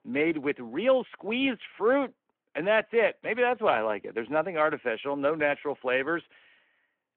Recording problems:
phone-call audio

